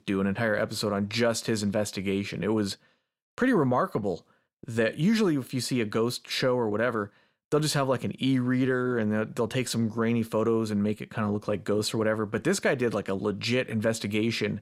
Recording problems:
none

